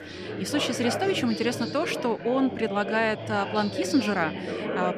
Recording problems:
background chatter; loud; throughout; 4 voices, 6 dB below the speech

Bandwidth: 15 kHz